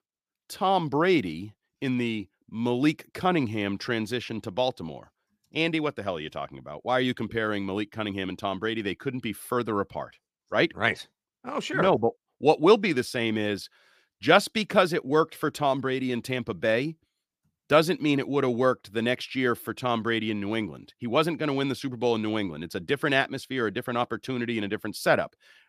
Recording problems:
none

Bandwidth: 15 kHz